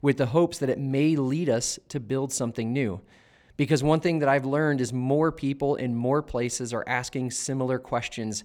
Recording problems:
none

